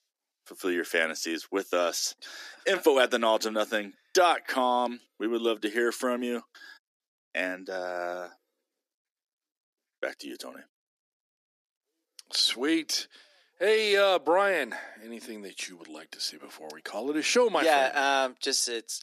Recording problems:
thin; somewhat; fading below 300 Hz

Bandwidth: 14.5 kHz